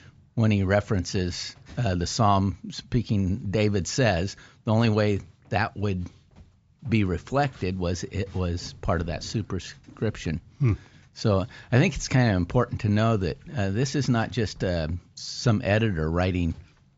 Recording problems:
high frequencies cut off; noticeable; nothing above 8 kHz

